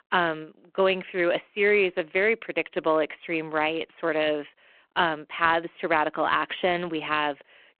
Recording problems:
phone-call audio

